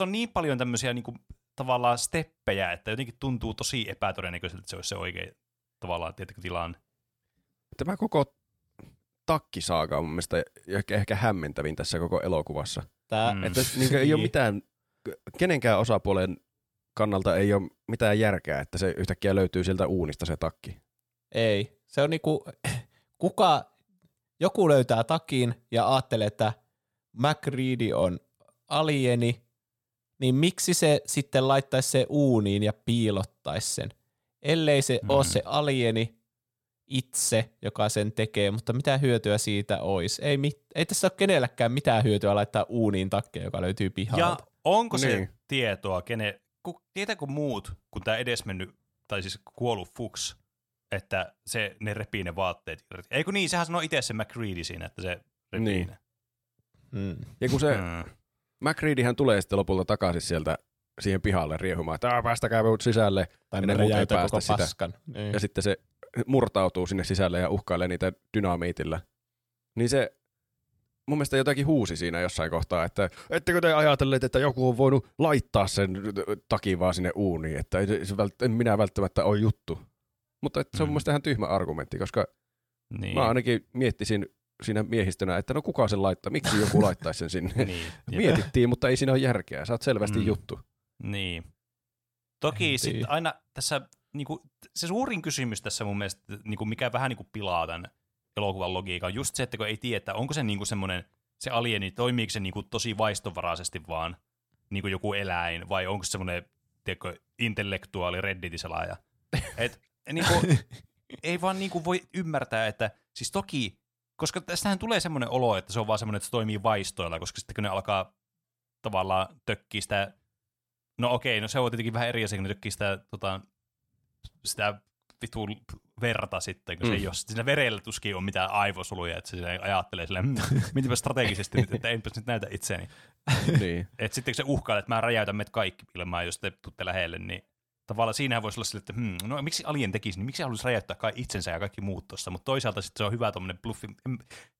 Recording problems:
abrupt cut into speech; at the start

